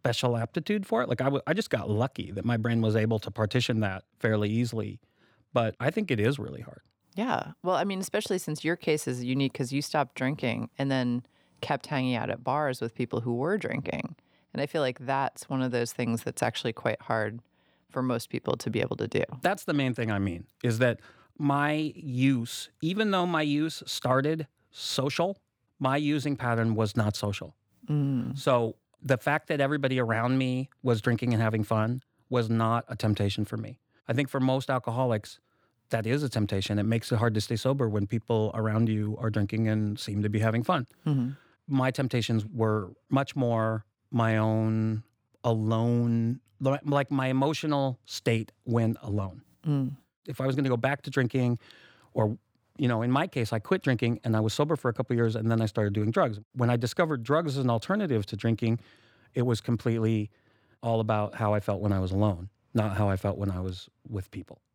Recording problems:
none

